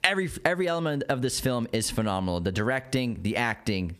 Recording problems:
squashed, flat; heavily

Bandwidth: 14.5 kHz